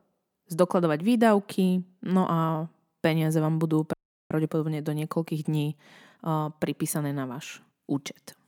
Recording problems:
audio cutting out; at 4 s

